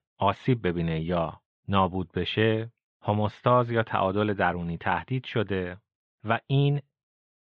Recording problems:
muffled; very; fading above 3.5 kHz

